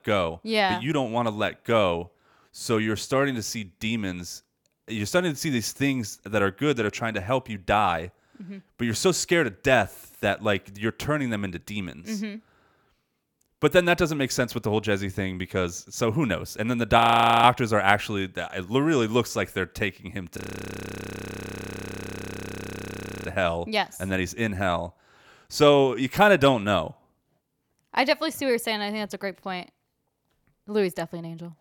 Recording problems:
audio freezing; at 17 s and at 20 s for 3 s

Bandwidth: 18.5 kHz